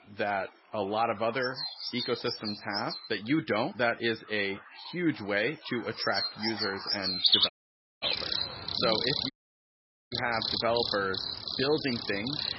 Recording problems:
garbled, watery; badly; nothing above 5.5 kHz
animal sounds; very loud; throughout; 1 dB above the speech
audio cutting out; at 7.5 s for 0.5 s and at 9.5 s for 1 s

